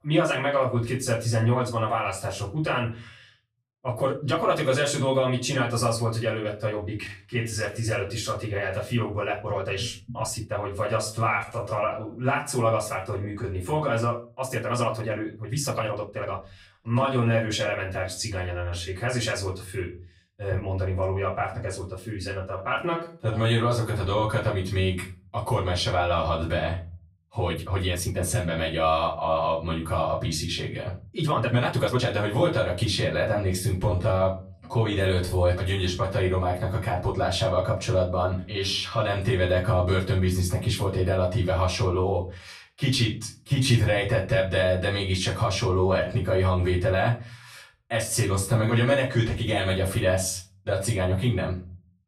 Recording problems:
off-mic speech; far
room echo; slight; dies away in 0.4 s
uneven, jittery; strongly; from 3.5 to 46 s

